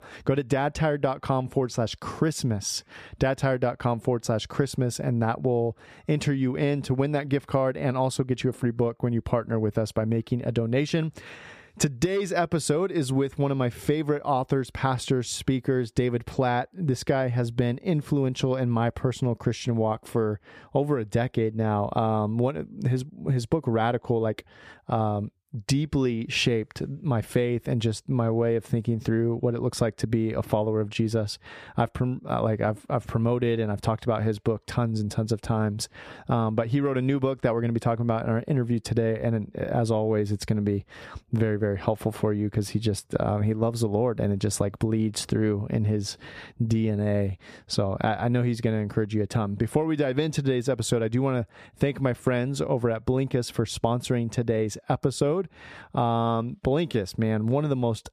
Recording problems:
squashed, flat; somewhat

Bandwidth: 14.5 kHz